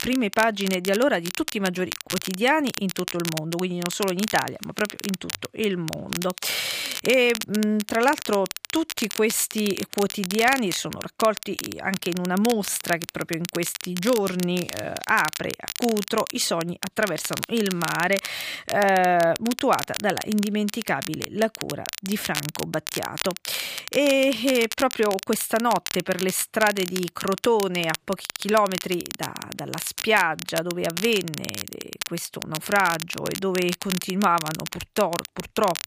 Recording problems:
crackle, like an old record; loud; 8 dB below the speech

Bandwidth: 15 kHz